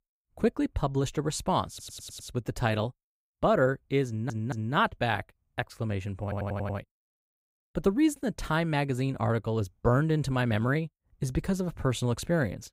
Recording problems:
audio stuttering; at 1.5 s, at 4 s and at 6 s

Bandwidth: 15.5 kHz